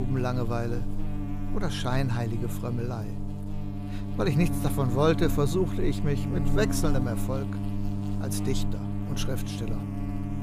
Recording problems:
electrical hum; loud; throughout; 50 Hz, 7 dB below the speech
abrupt cut into speech; at the start

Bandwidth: 15 kHz